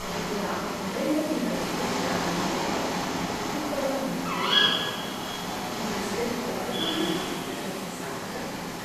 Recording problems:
room echo; strong; dies away in 1 s
off-mic speech; far
echo of what is said; faint; from 5 s on; 490 ms later, 20 dB below the speech
animal sounds; very loud; throughout; 5 dB above the speech
background chatter; loud; throughout; 4 voices, 7 dB below the speech
hiss; noticeable; throughout; 10 dB below the speech

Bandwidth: 14 kHz